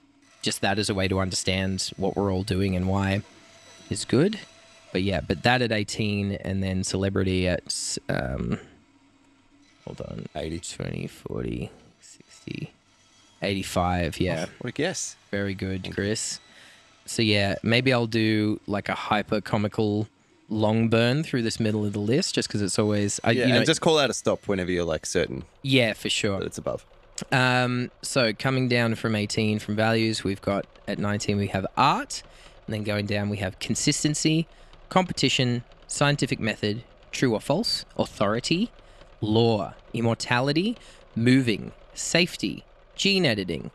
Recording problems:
machinery noise; faint; throughout; 30 dB below the speech

